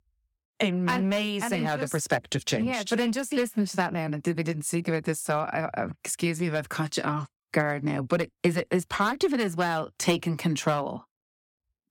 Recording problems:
none

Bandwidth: 17.5 kHz